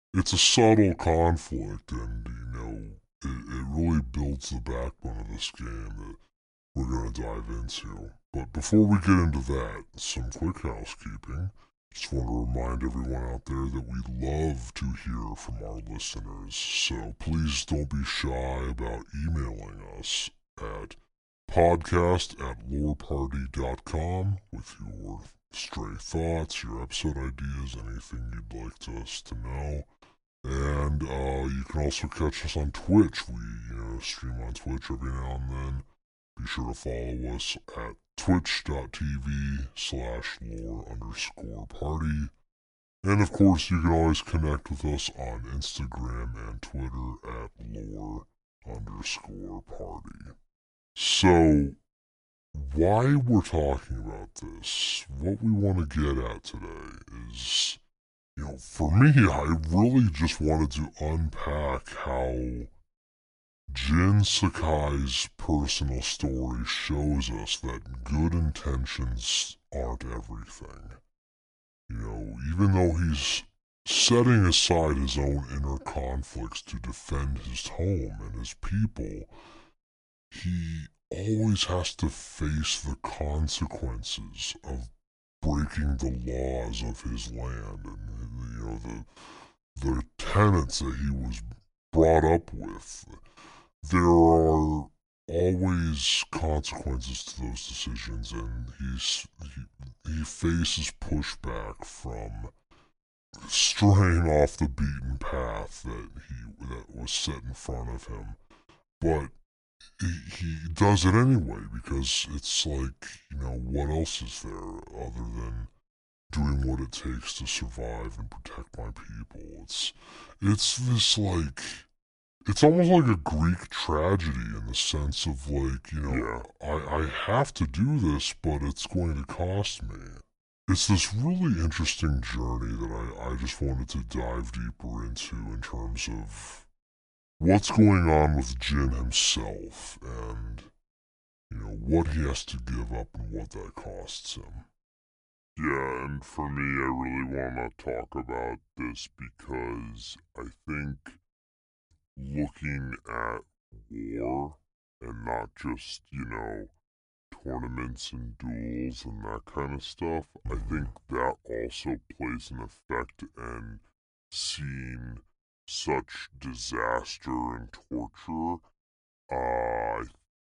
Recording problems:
wrong speed and pitch; too slow and too low; 0.7 times normal speed

